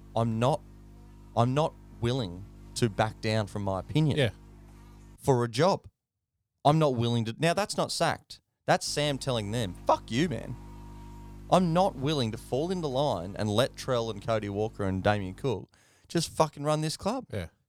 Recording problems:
electrical hum; faint; until 5 s and from 9 to 15 s; 50 Hz, 30 dB below the speech

